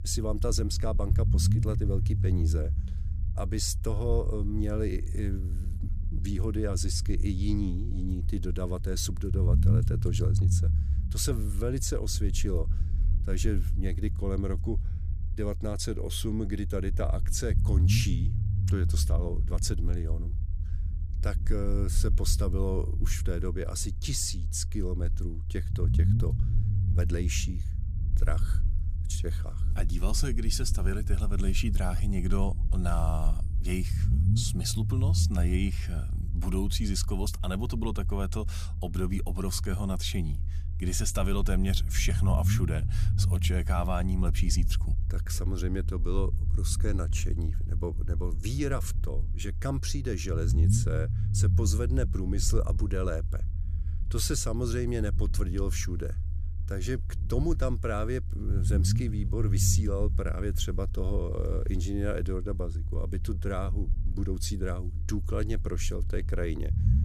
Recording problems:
low rumble; noticeable; throughout; 10 dB below the speech

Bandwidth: 14.5 kHz